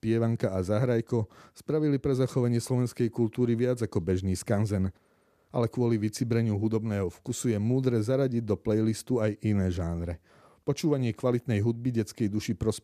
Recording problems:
none

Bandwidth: 14.5 kHz